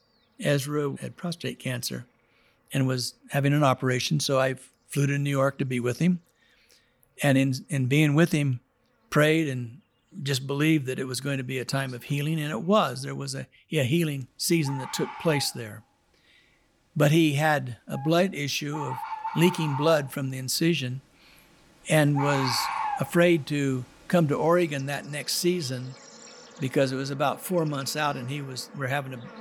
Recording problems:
animal sounds; noticeable; throughout; 10 dB below the speech

